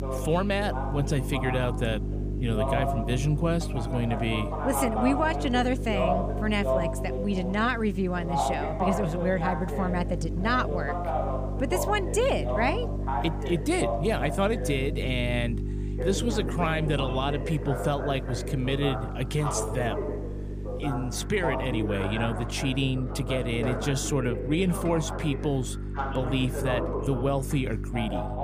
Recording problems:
voice in the background; loud; throughout; 5 dB below the speech
electrical hum; noticeable; throughout; 50 Hz, 15 dB below the speech
rain or running water; faint; throughout; 20 dB below the speech

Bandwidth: 15 kHz